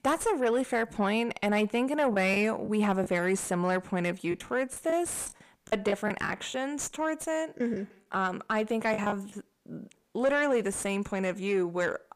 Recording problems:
distortion; slight; 10 dB below the speech
choppy; very; at 2 s, from 4.5 to 6.5 s and from 7.5 to 9.5 s; 11% of the speech affected

